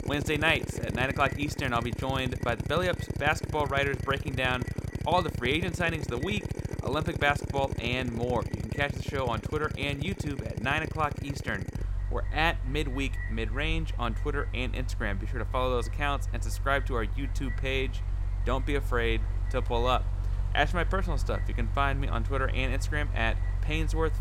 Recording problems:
echo of what is said; faint; throughout; 250 ms later, 20 dB below the speech
machinery noise; loud; throughout; 3 dB below the speech

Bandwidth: 16 kHz